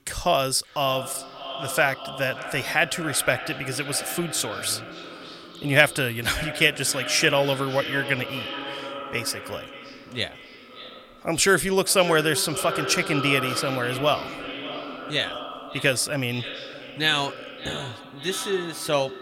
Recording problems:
echo of what is said; strong; throughout; 580 ms later, 10 dB below the speech

